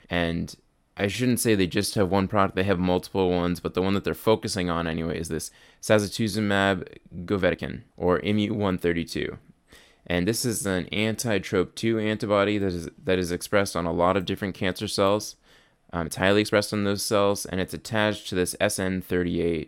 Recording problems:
uneven, jittery; strongly; from 1 to 19 s

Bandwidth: 16.5 kHz